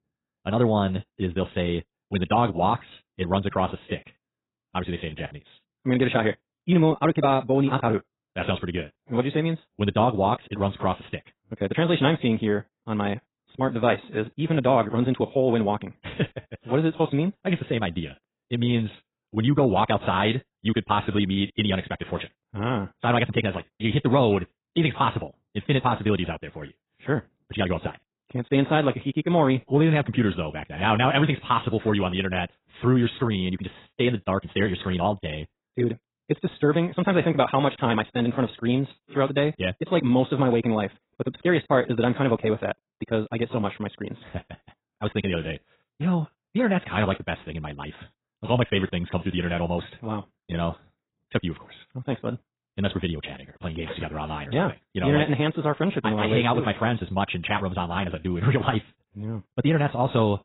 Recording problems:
garbled, watery; badly; nothing above 4 kHz
wrong speed, natural pitch; too fast; 1.8 times normal speed

